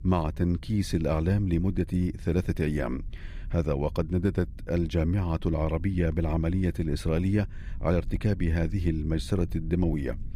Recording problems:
low rumble; faint; throughout; 25 dB below the speech

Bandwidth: 15 kHz